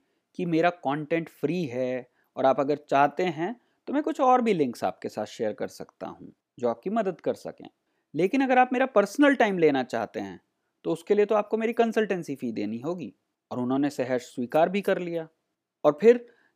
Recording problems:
none

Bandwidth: 15 kHz